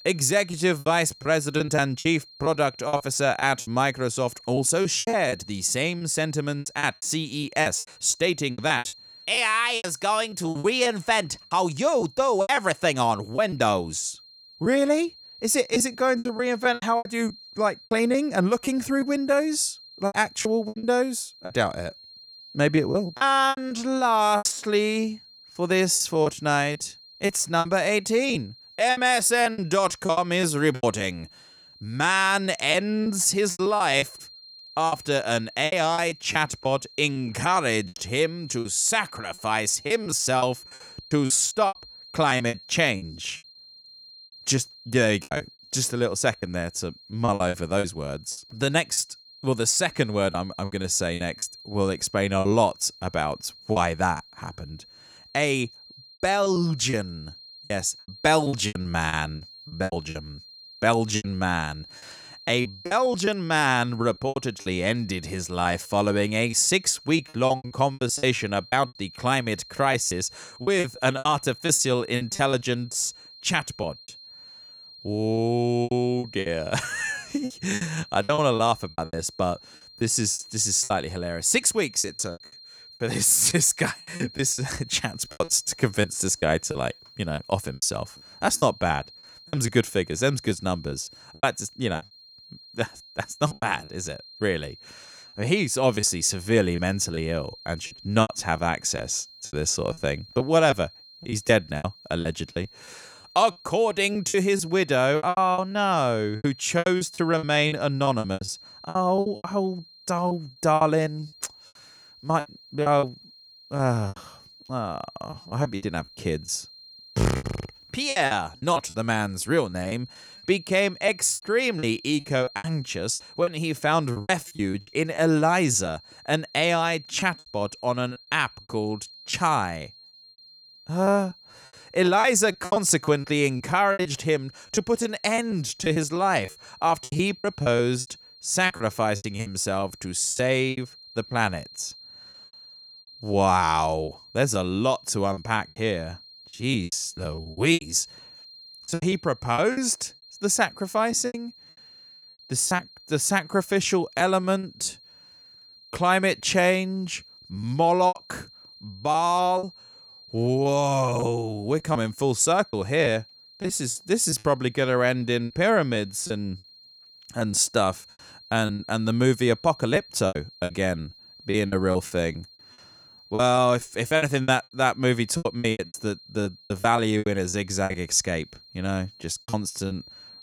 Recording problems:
high-pitched whine; faint; throughout; 4 kHz, 20 dB below the speech
choppy; very; 12% of the speech affected

